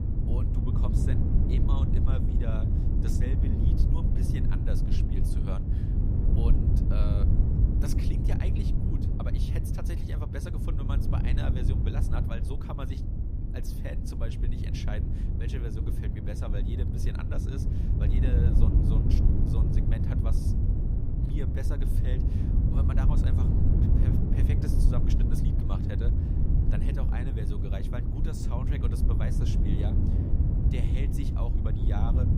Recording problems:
wind noise on the microphone; heavy; 3 dB above the speech

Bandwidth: 15.5 kHz